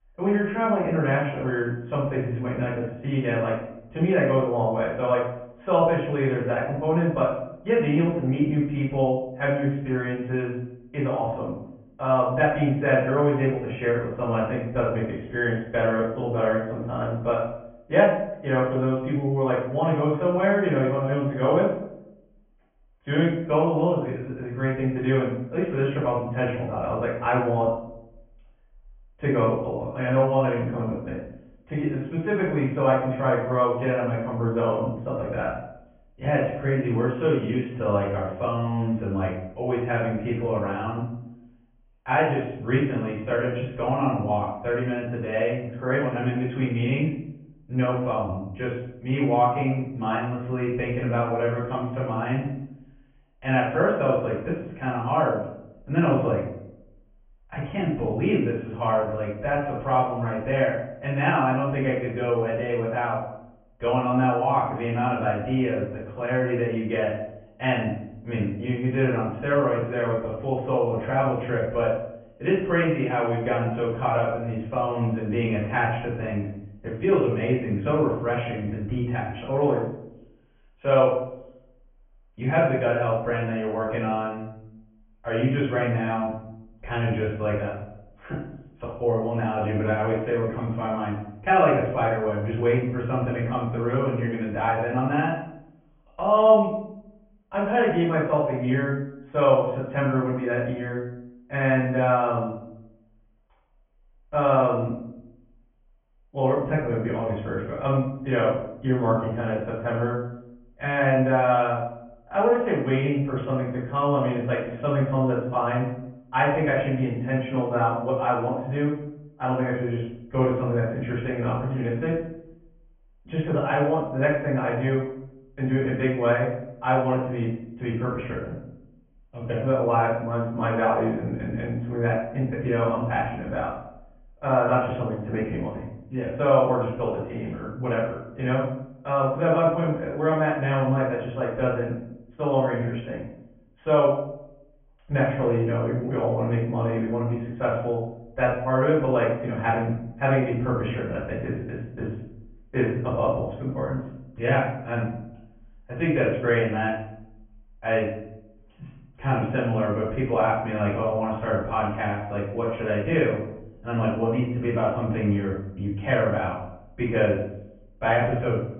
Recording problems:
off-mic speech; far
high frequencies cut off; severe; nothing above 3.5 kHz
room echo; noticeable; dies away in 0.7 s

